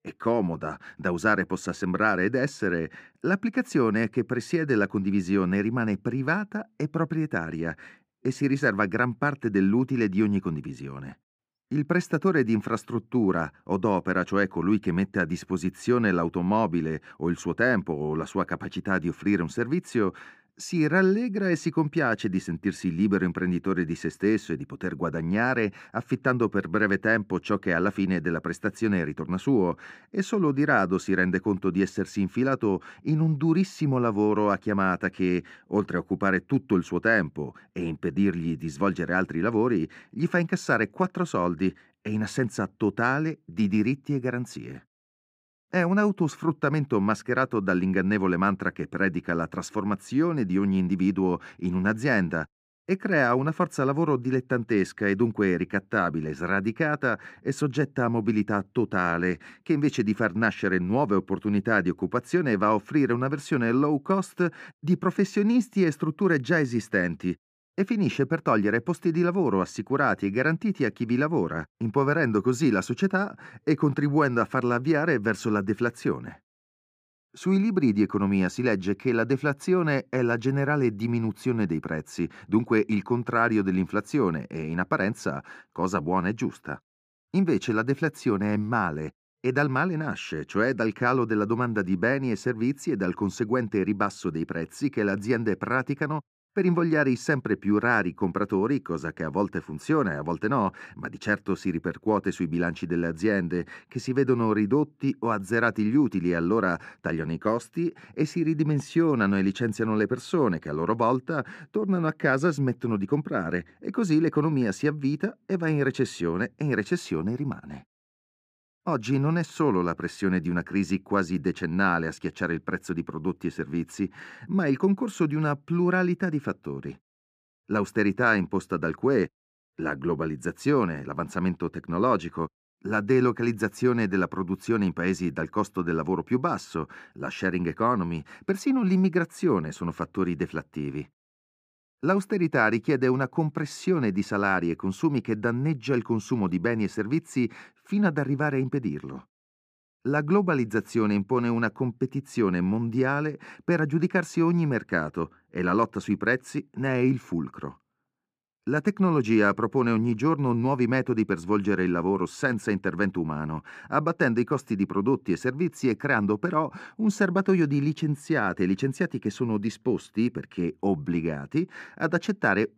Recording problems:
muffled; slightly; fading above 4 kHz

